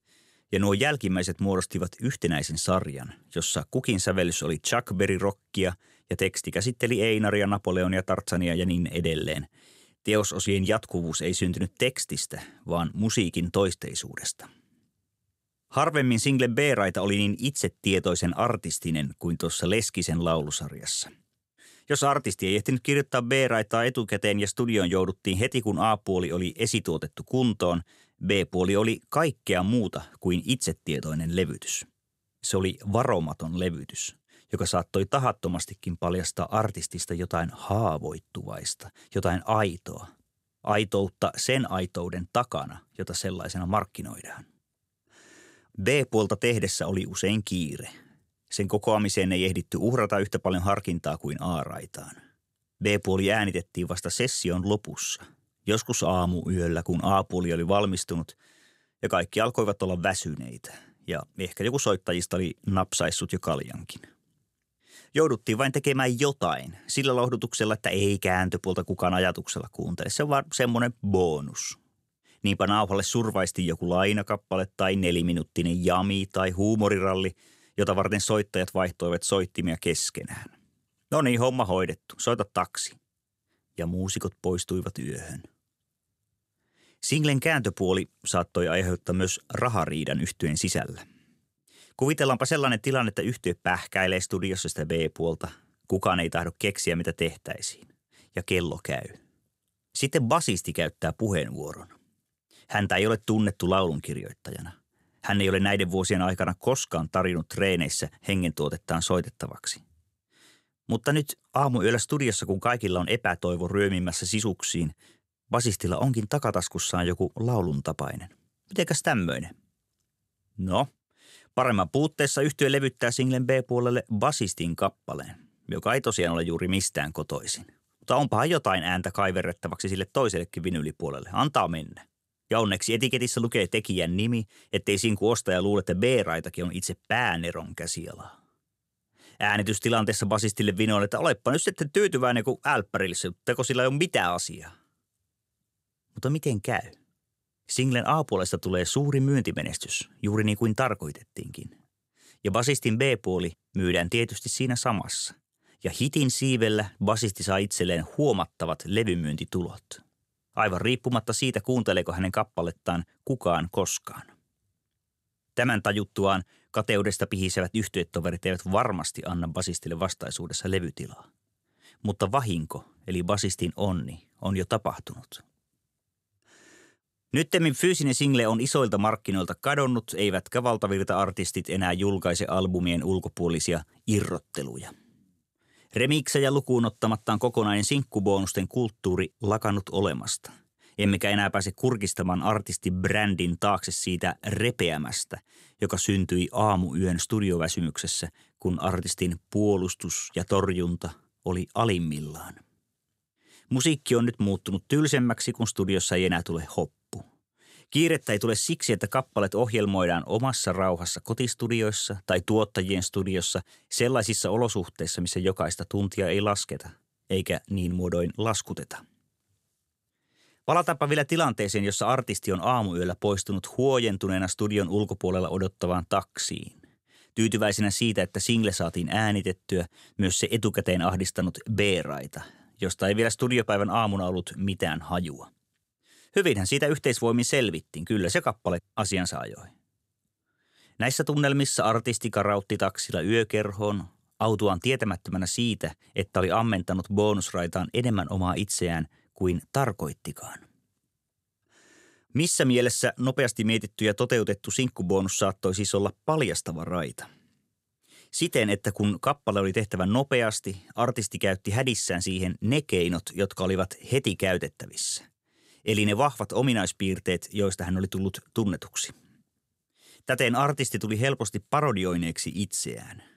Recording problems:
none

